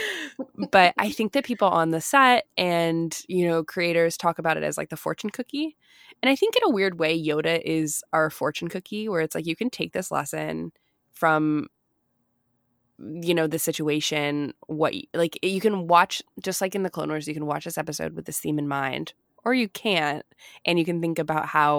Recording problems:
abrupt cut into speech; at the start and the end

